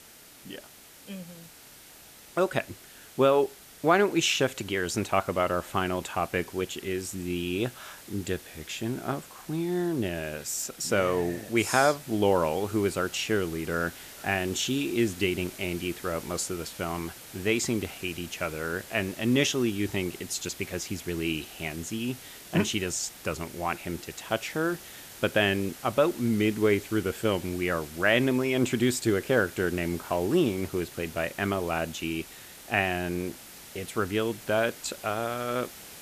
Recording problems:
hiss; noticeable; throughout; 15 dB below the speech

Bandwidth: 14.5 kHz